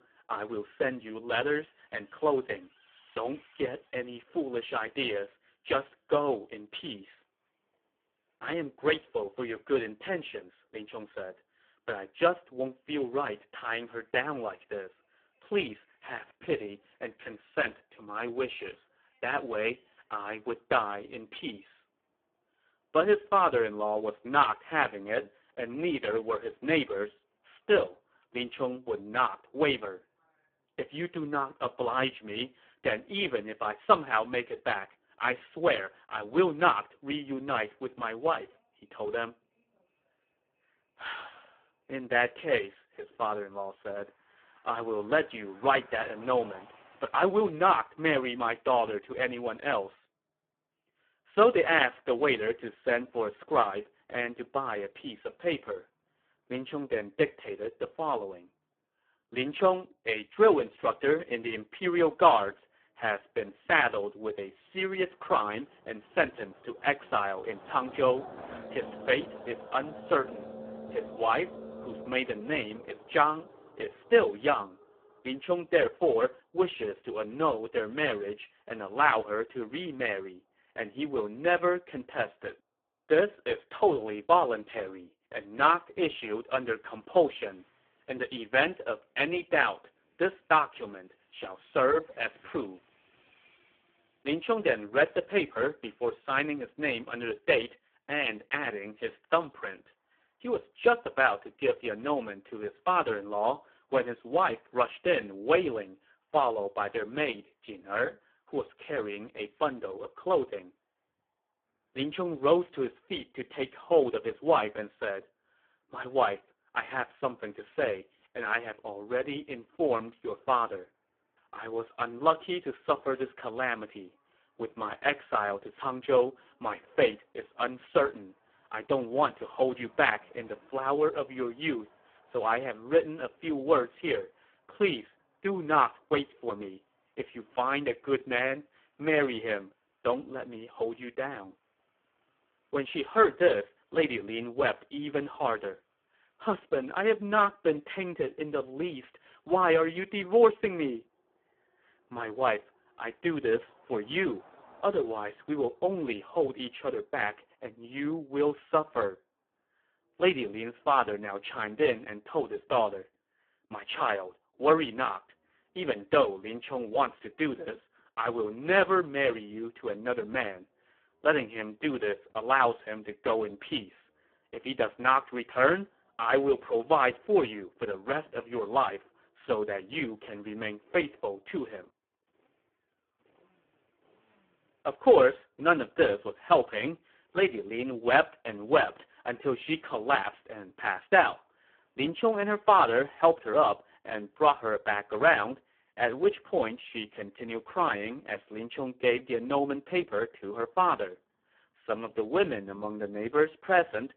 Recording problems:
phone-call audio; poor line
traffic noise; faint; throughout; 20 dB below the speech

